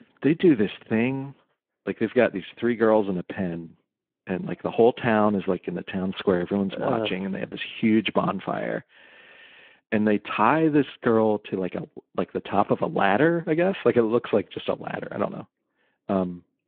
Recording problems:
phone-call audio

